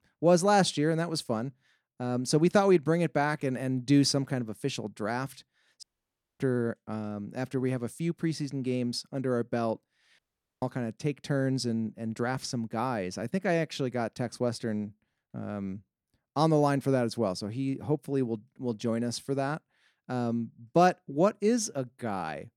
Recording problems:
audio cutting out; at 6 s for 0.5 s and at 10 s

